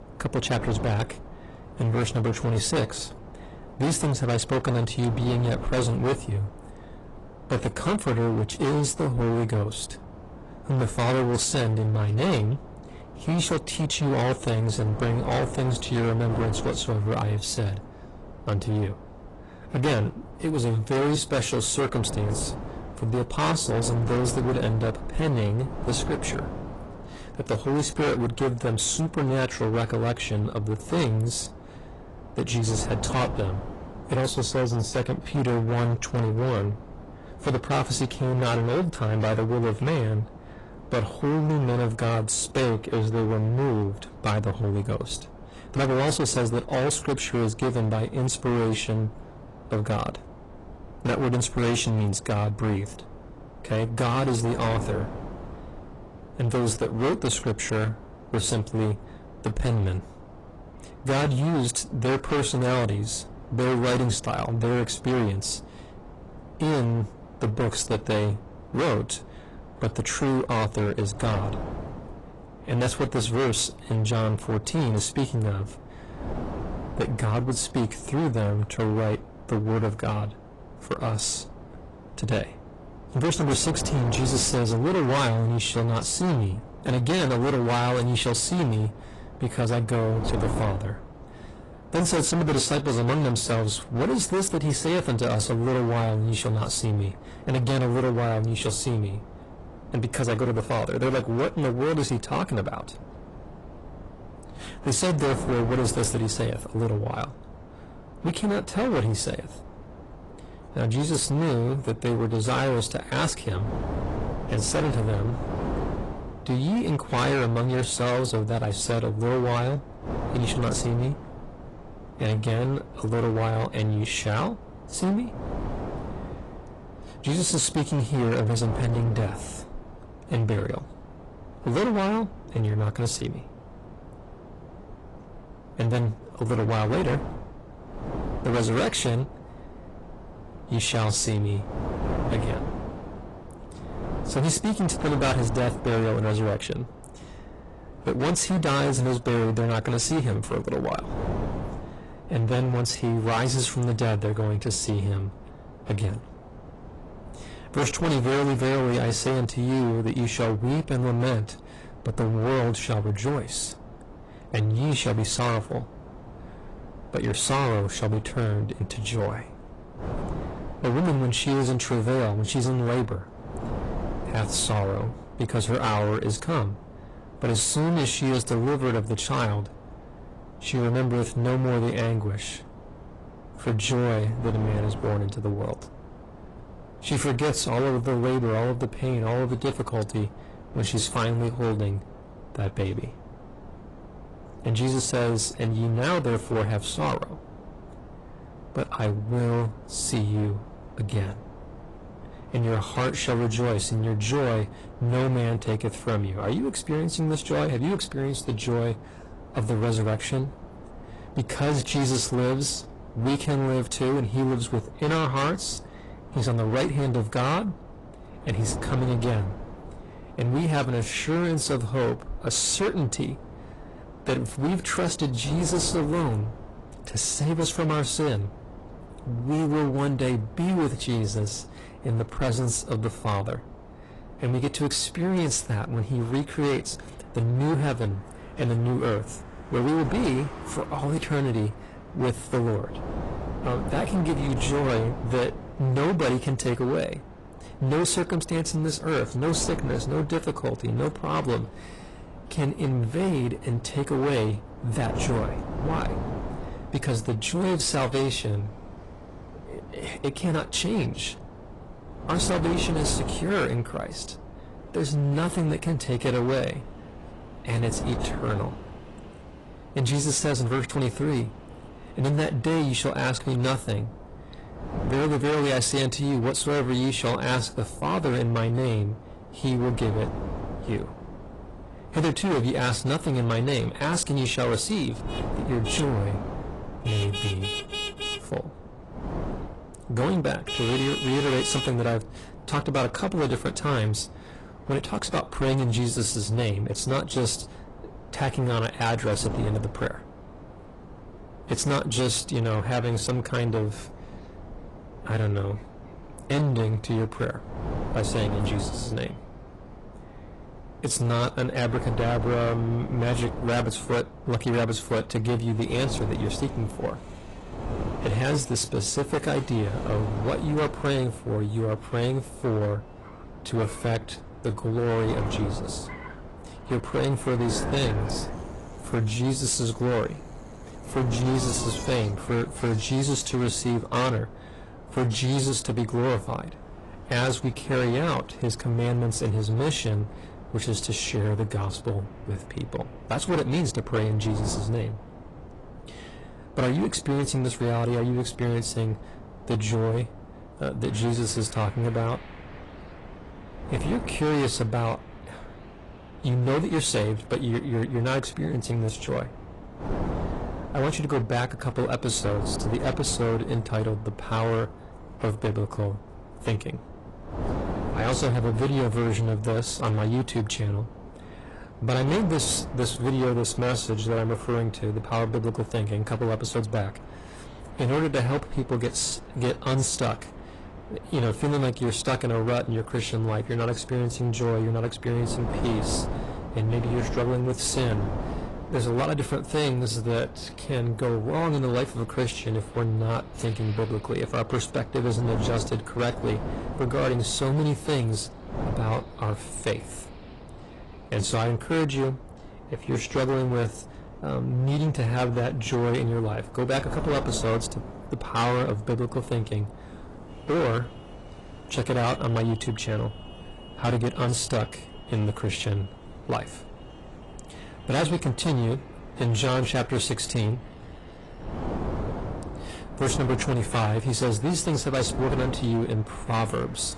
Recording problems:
distortion; heavy; 17% of the sound clipped
garbled, watery; slightly; nothing above 10 kHz
traffic noise; noticeable; from 3:56 on; 20 dB below the speech
wind noise on the microphone; occasional gusts; 15 dB below the speech

